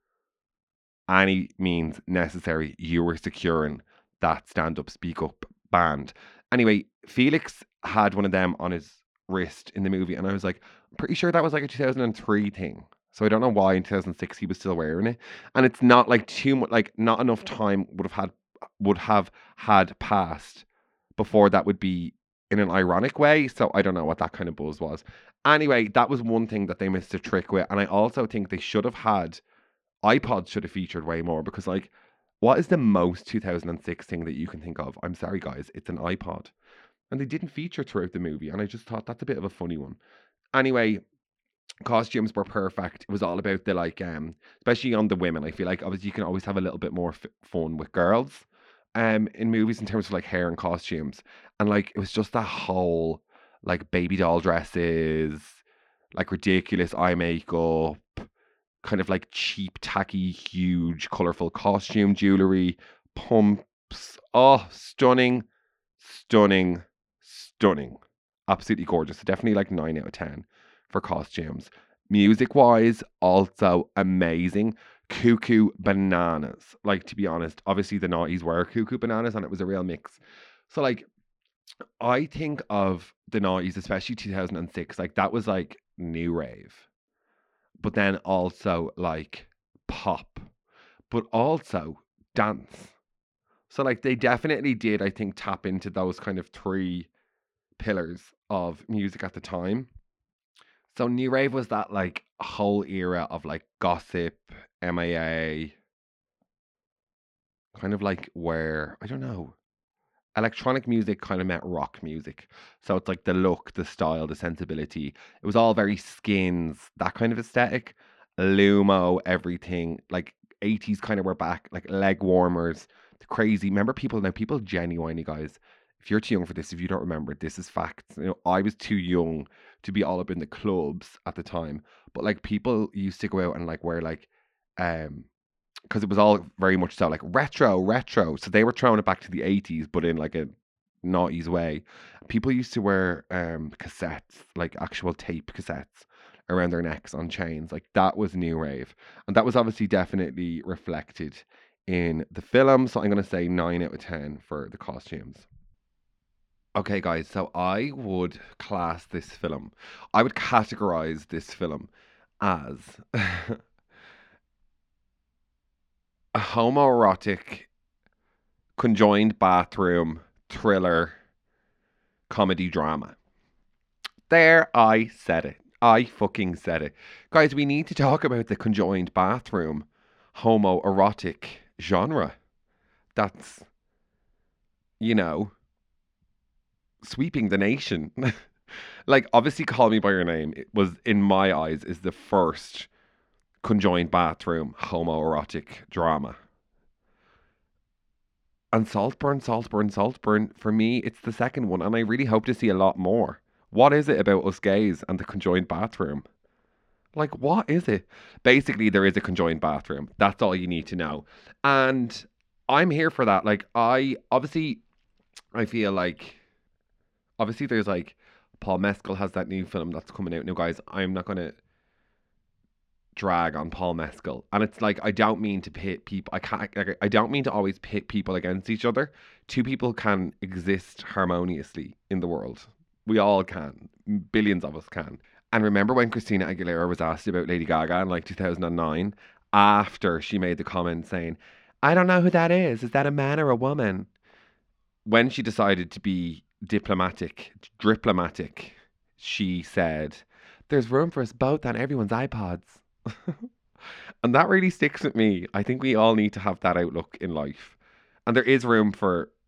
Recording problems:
muffled; very slightly; fading above 3.5 kHz

